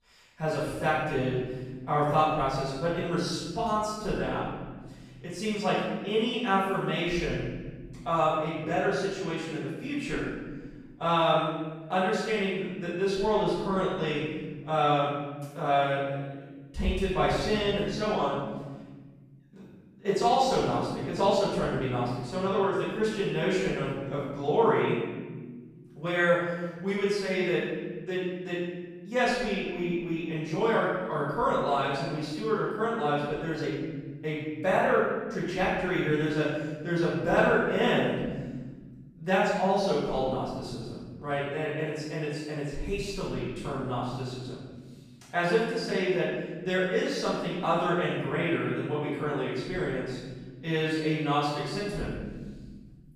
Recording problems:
room echo; strong; dies away in 1.6 s
off-mic speech; far

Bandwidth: 14.5 kHz